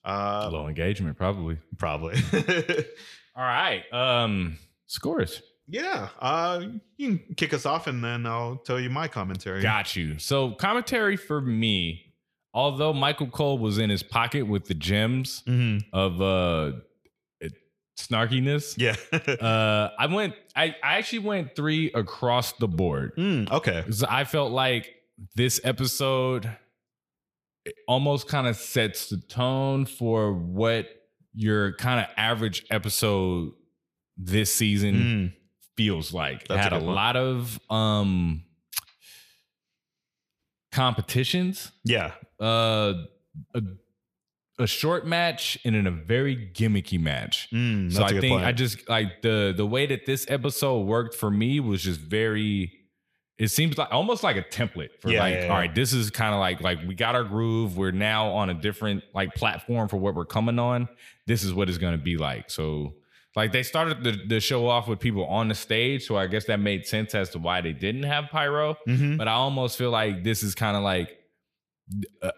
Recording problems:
echo of what is said; faint; throughout; 110 ms later, 25 dB below the speech

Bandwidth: 15 kHz